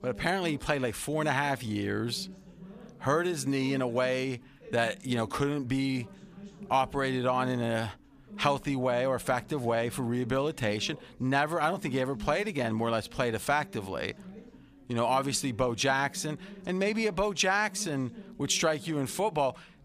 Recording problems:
background chatter; noticeable; throughout; 4 voices, 20 dB below the speech

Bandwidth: 15 kHz